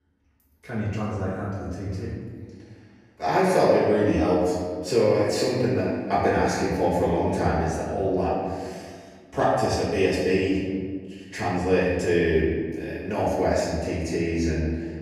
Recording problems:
off-mic speech; far
room echo; noticeable; dies away in 1.6 s

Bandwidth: 14.5 kHz